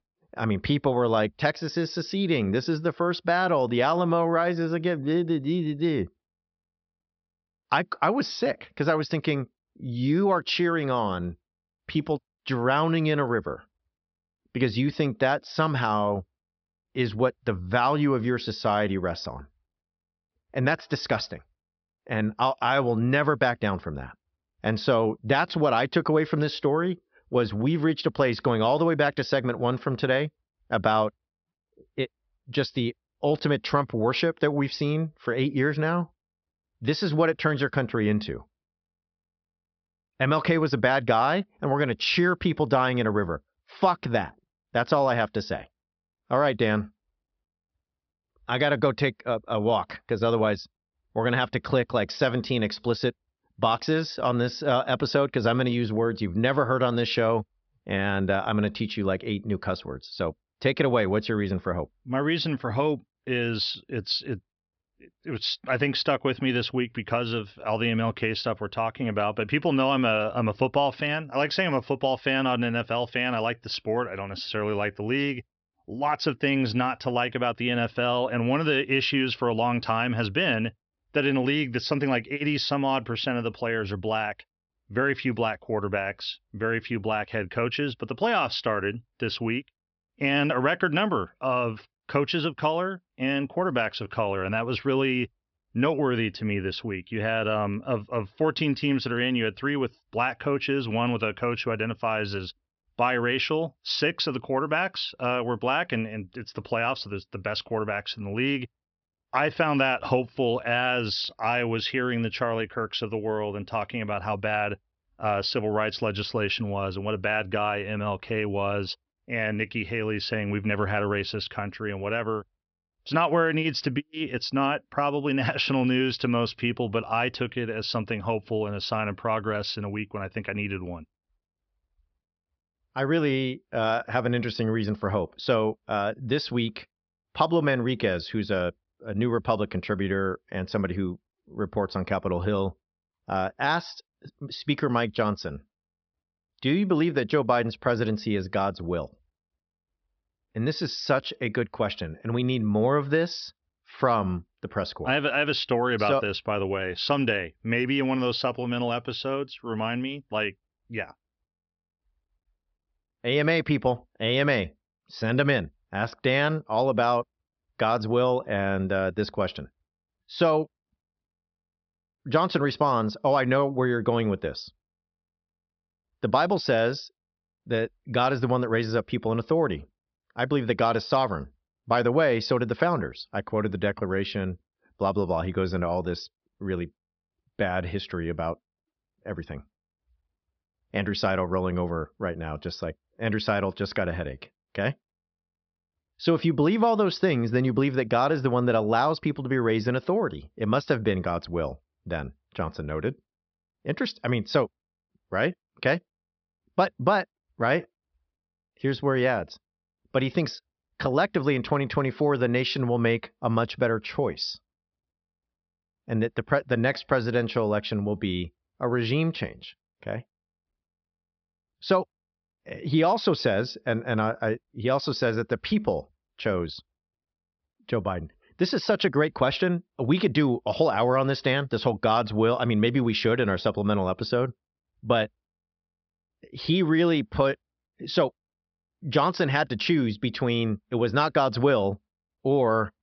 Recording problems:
high frequencies cut off; noticeable; nothing above 5.5 kHz

